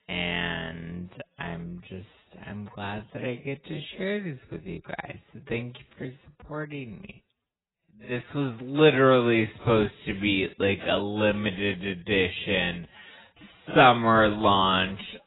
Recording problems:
garbled, watery; badly; nothing above 4 kHz
wrong speed, natural pitch; too slow; 0.5 times normal speed

